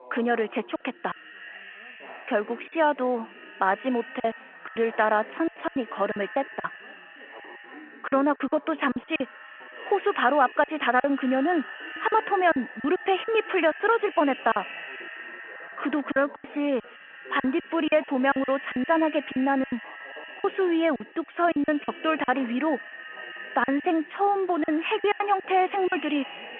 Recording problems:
muffled; very; fading above 3.5 kHz
echo of what is said; noticeable; throughout; 300 ms later, 15 dB below the speech
phone-call audio
background chatter; faint; throughout; 4 voices, 25 dB below the speech
choppy; very; 13% of the speech affected

